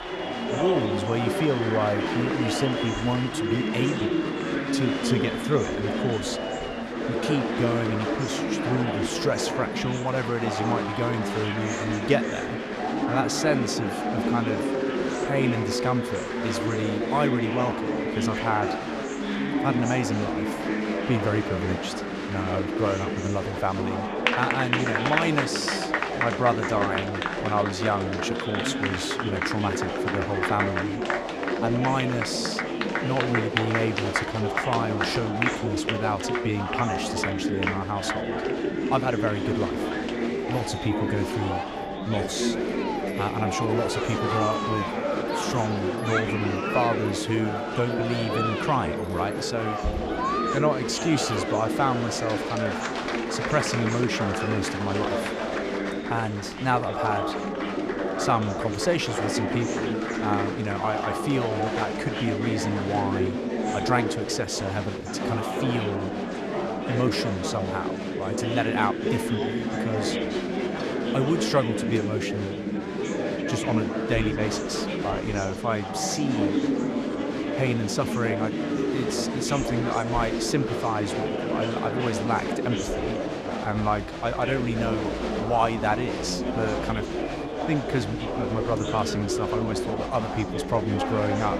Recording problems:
chatter from many people; very loud; throughout; as loud as the speech

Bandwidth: 14.5 kHz